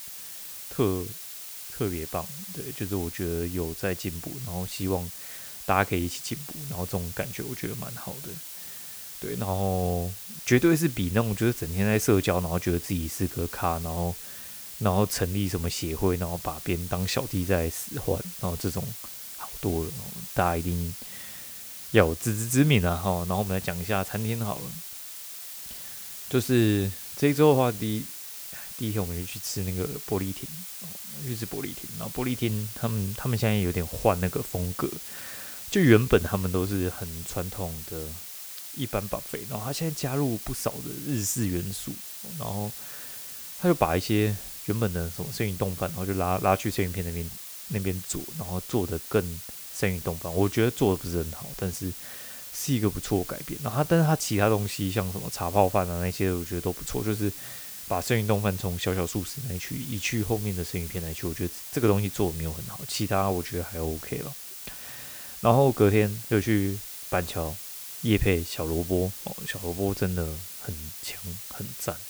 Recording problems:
hiss; loud; throughout; 9 dB below the speech

